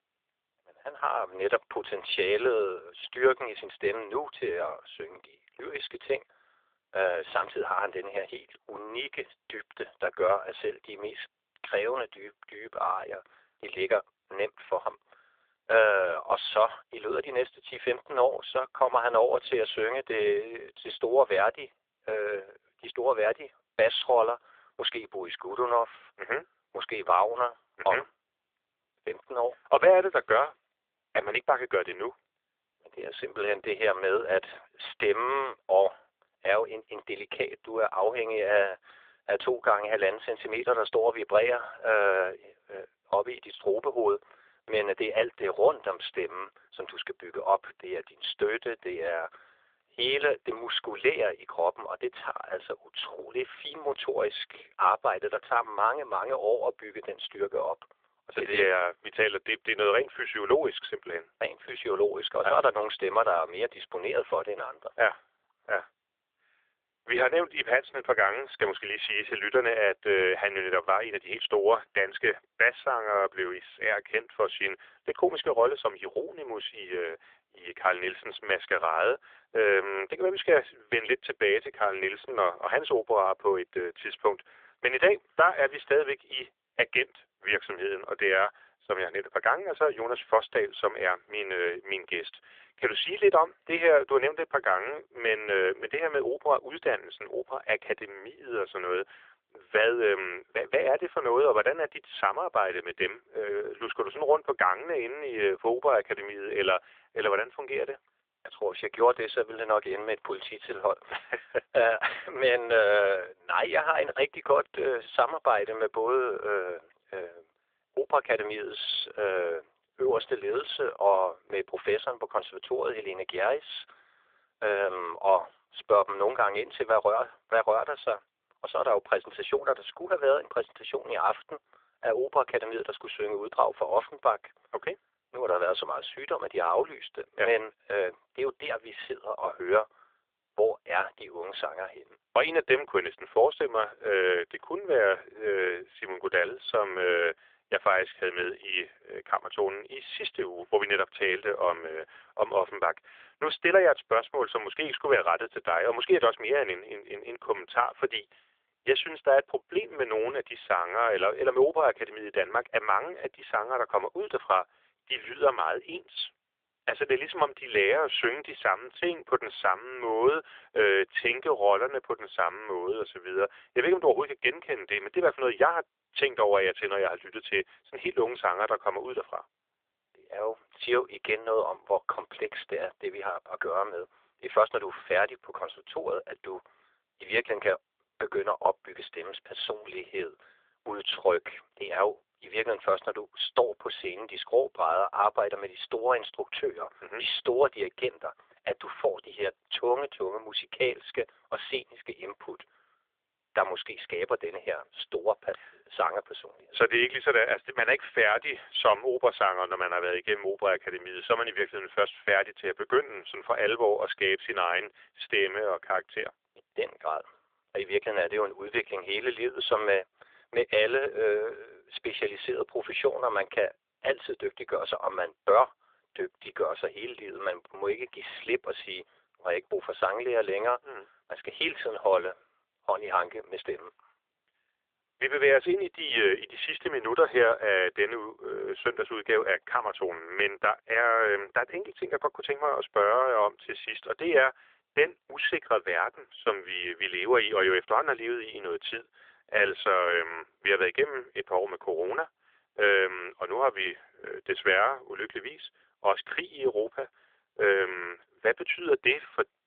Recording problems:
phone-call audio; nothing above 3.5 kHz

